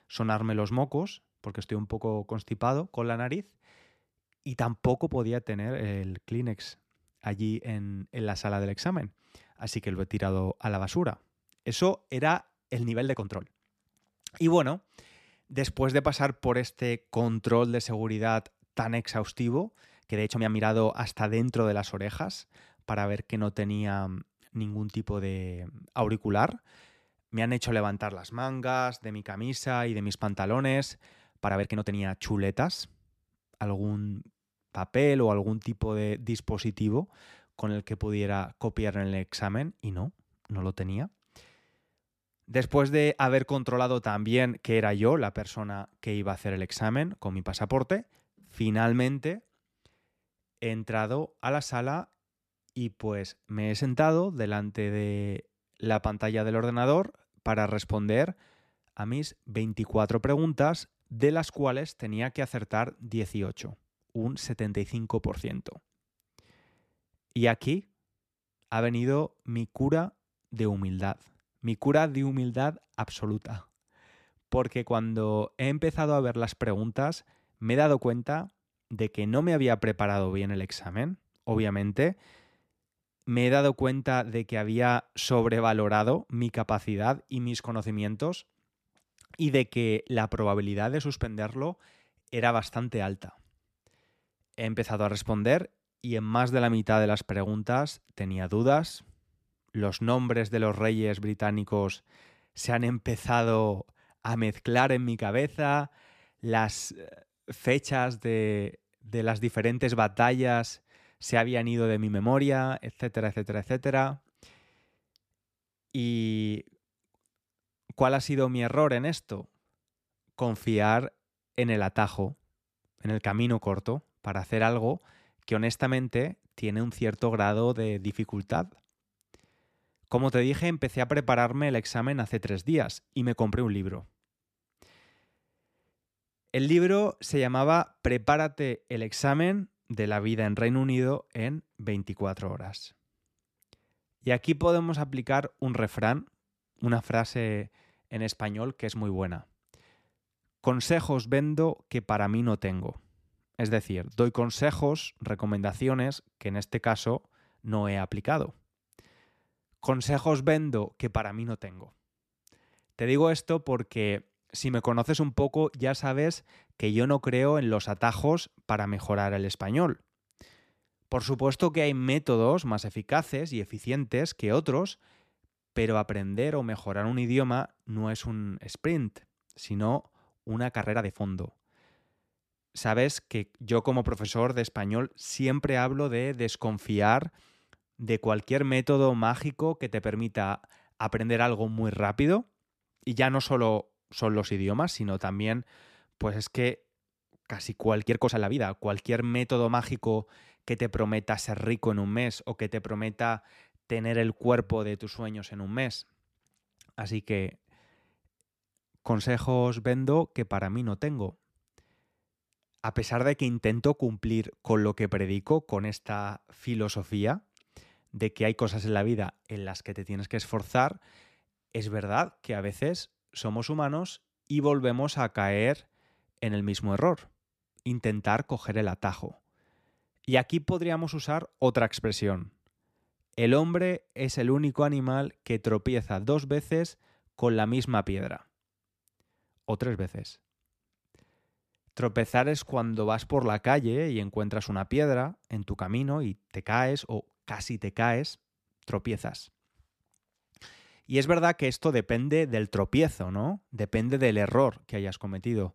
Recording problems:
uneven, jittery; strongly; from 13 s to 4:03

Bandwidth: 14.5 kHz